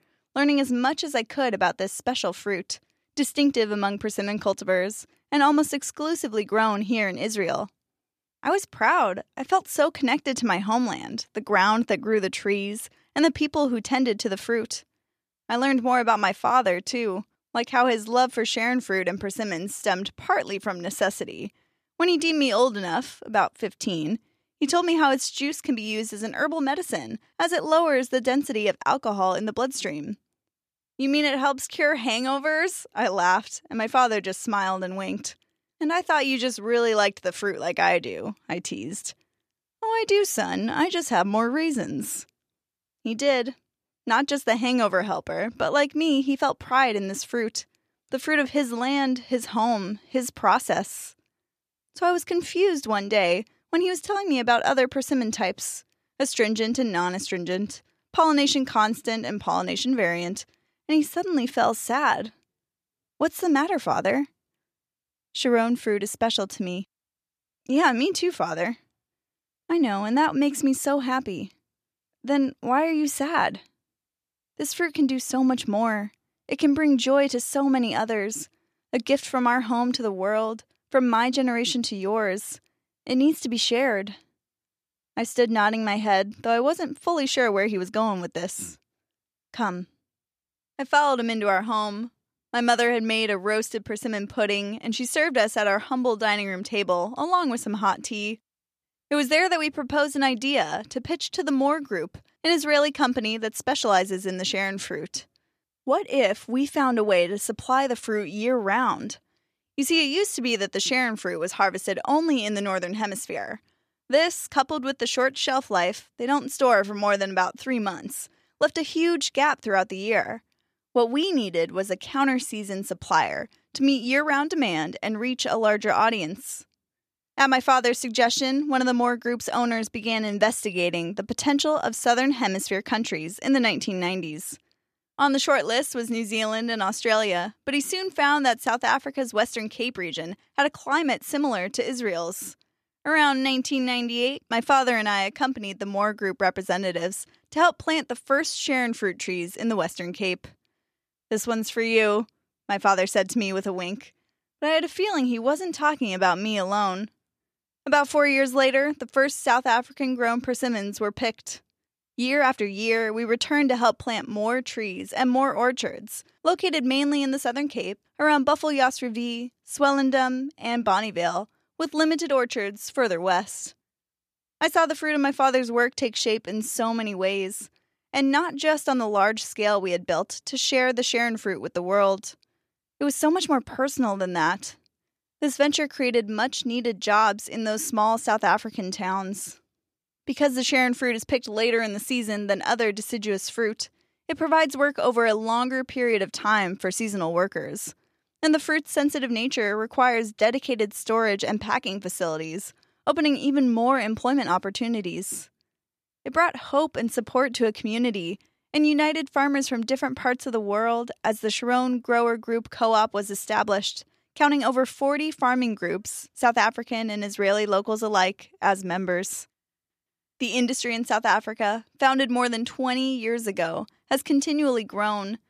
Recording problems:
none

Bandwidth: 14.5 kHz